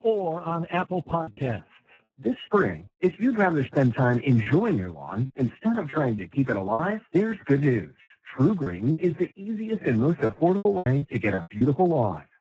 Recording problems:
garbled, watery; badly; nothing above 7.5 kHz
choppy; very; at 1 s, from 4.5 to 7 s and from 8 to 12 s; 9% of the speech affected

